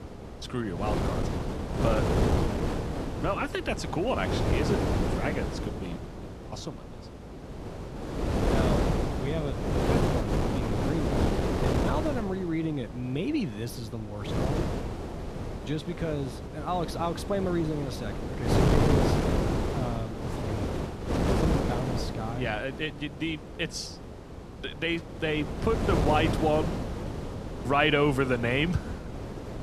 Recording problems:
wind noise on the microphone; heavy; 2 dB below the speech

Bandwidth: 13.5 kHz